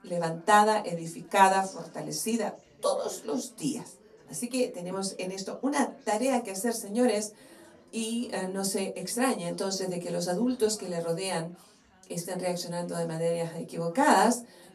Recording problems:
off-mic speech; far
room echo; very slight; dies away in 0.2 s
background chatter; faint; throughout; 4 voices, 25 dB below the speech

